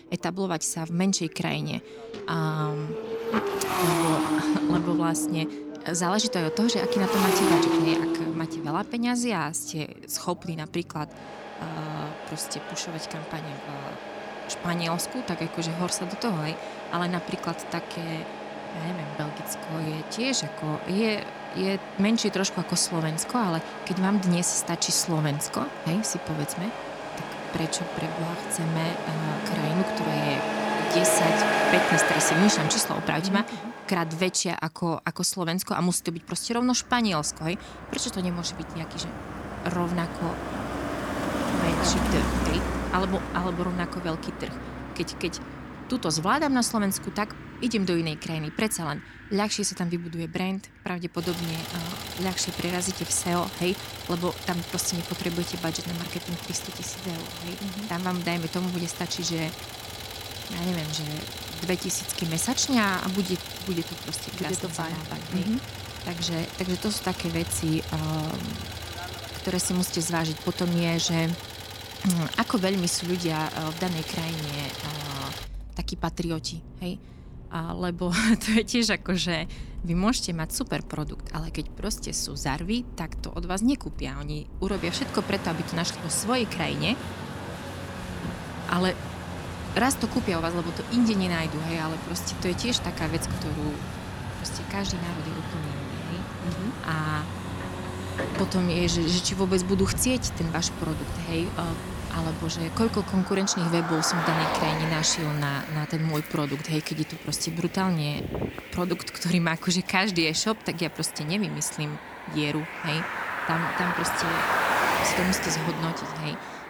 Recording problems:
traffic noise; loud; throughout; 4 dB below the speech

